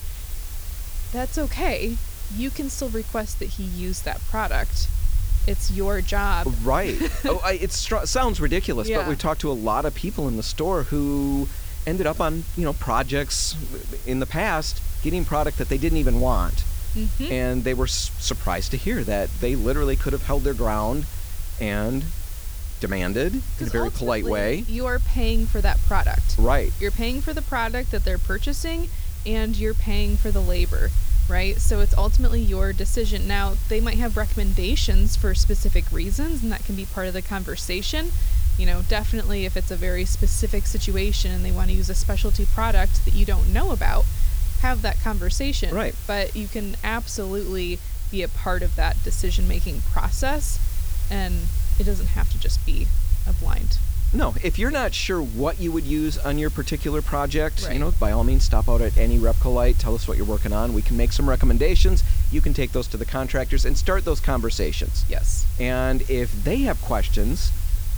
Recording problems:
hiss; noticeable; throughout; 10 dB below the speech
low rumble; faint; throughout; 20 dB below the speech

